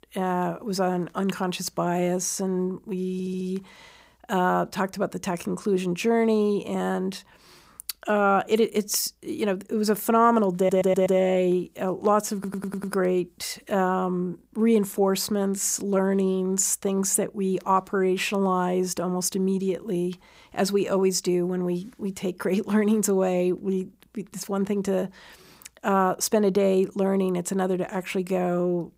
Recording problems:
audio stuttering; at 3 s, at 11 s and at 12 s

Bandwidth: 15.5 kHz